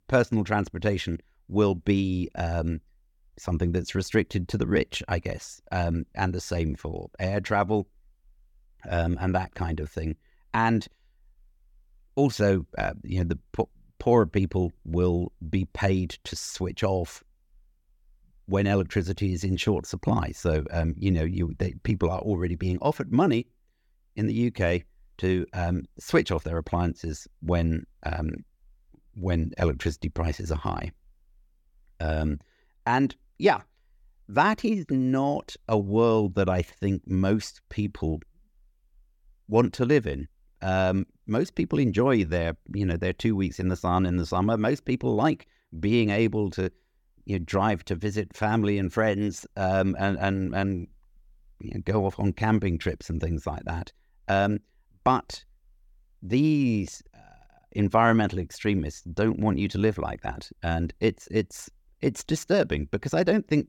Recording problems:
none

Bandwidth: 17.5 kHz